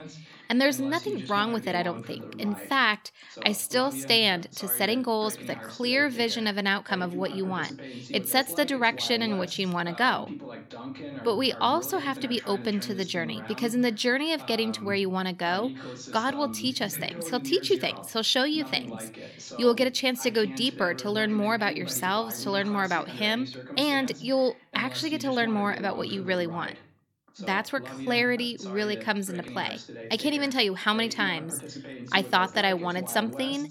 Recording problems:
voice in the background; noticeable; throughout; 15 dB below the speech

